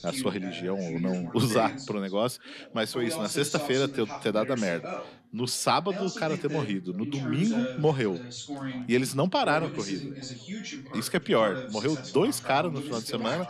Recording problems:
background chatter; loud; throughout; 3 voices, 9 dB below the speech

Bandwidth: 13.5 kHz